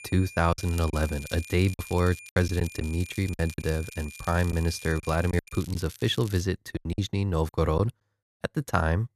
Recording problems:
high-pitched whine; noticeable; until 5.5 s; 2.5 kHz, 15 dB below the speech
crackling; noticeable; from 0.5 to 6.5 s; 20 dB below the speech
choppy; very; 8% of the speech affected

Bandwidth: 13.5 kHz